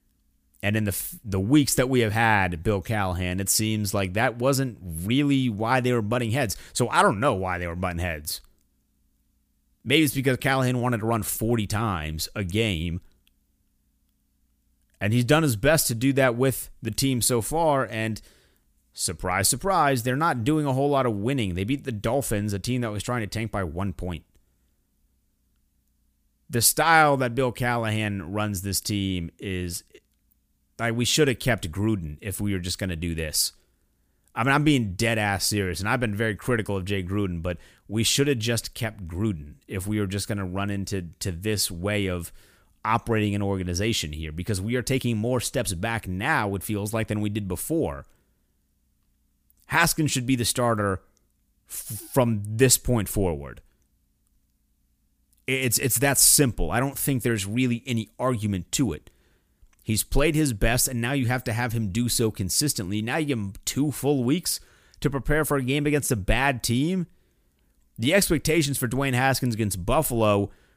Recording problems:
none

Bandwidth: 15 kHz